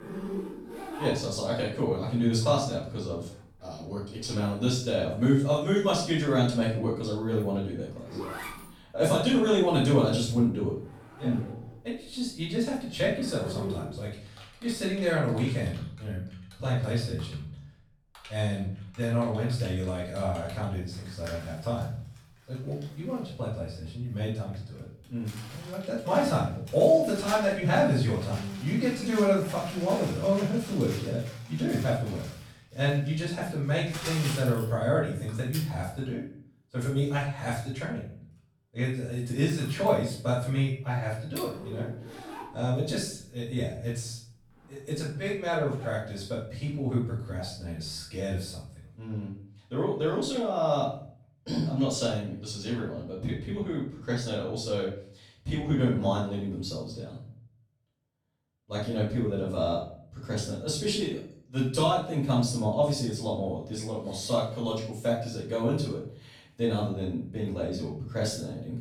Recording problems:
off-mic speech; far
room echo; noticeable; dies away in 0.5 s
household noises; noticeable; until 48 s; 15 dB below the speech

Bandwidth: 19 kHz